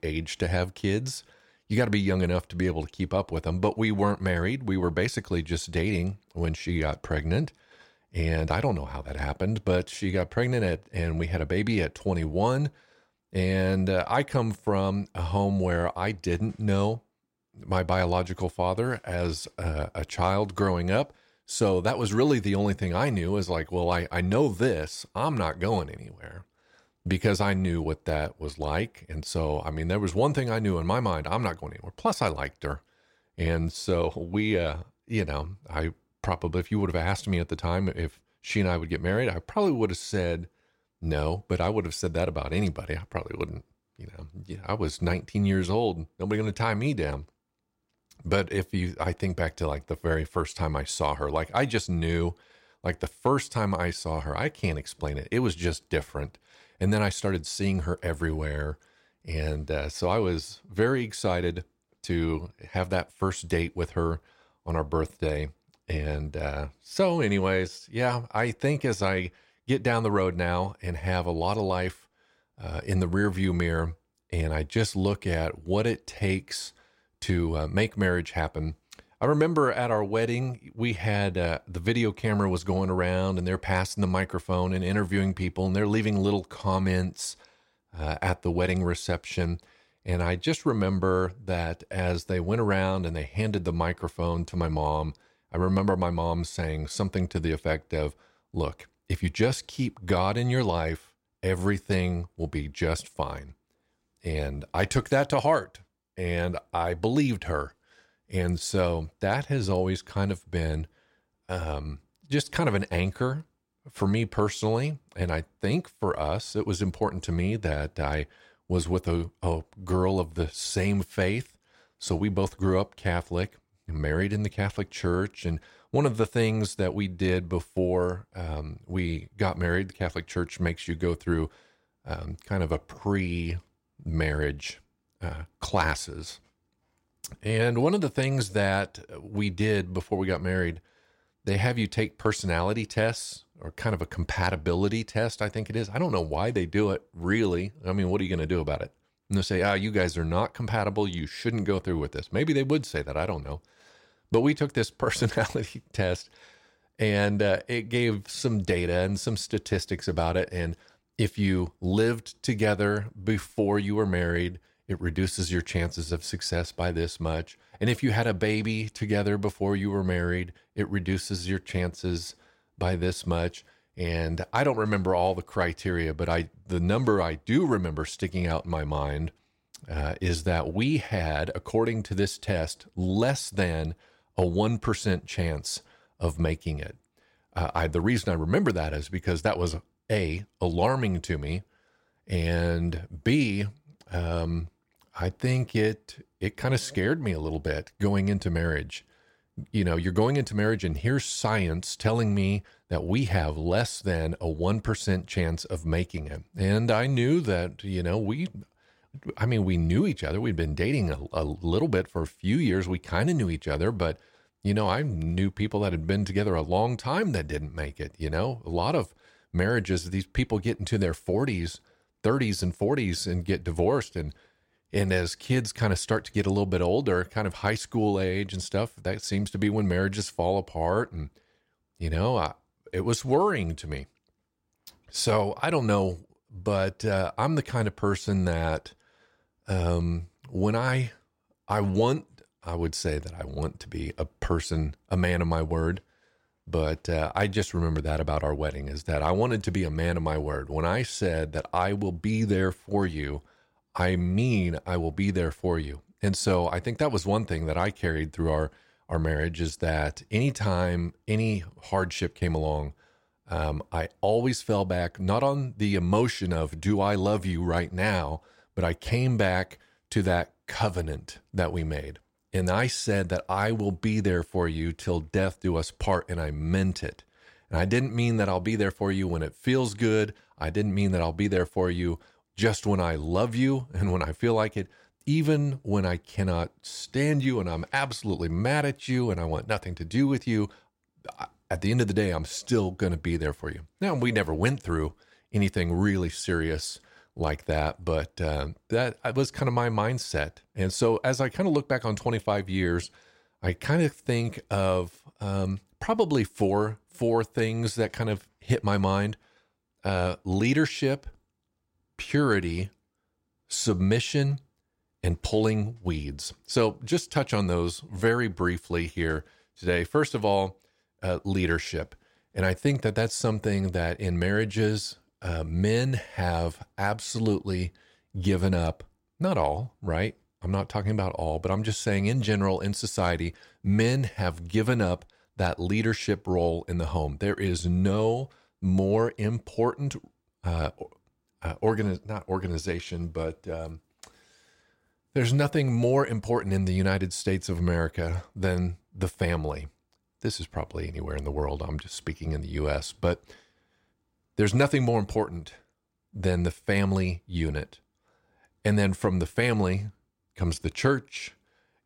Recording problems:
none

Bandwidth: 16 kHz